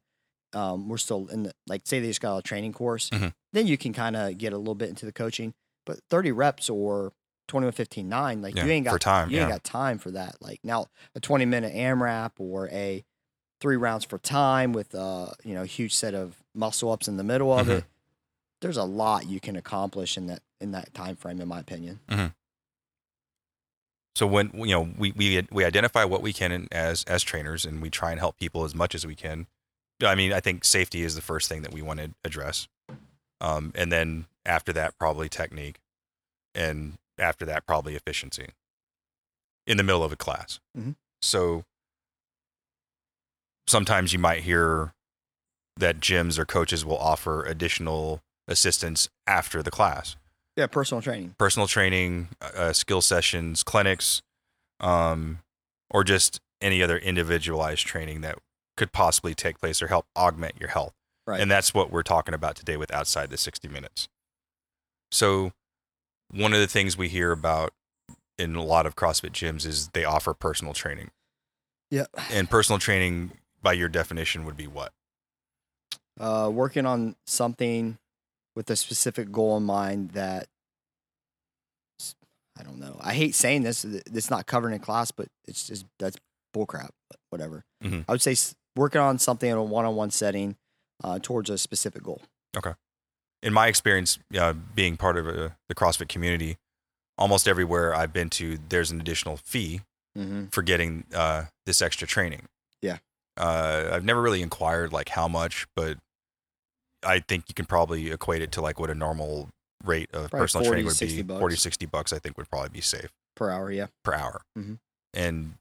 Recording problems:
none

